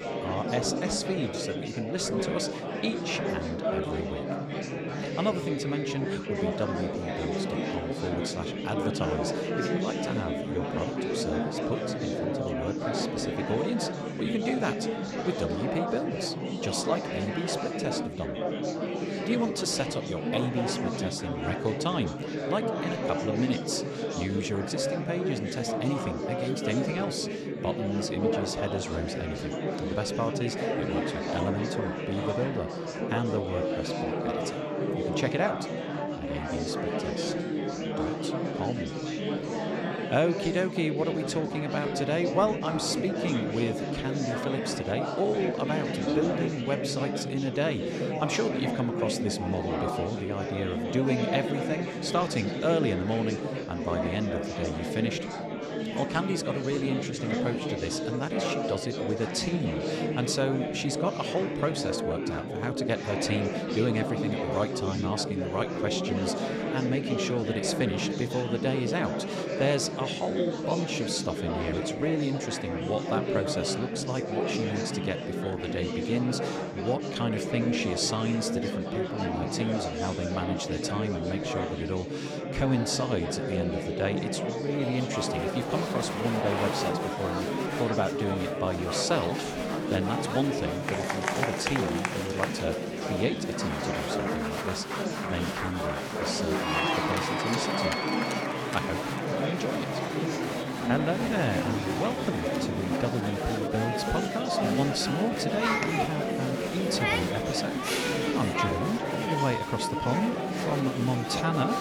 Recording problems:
murmuring crowd; very loud; throughout; 1 dB above the speech

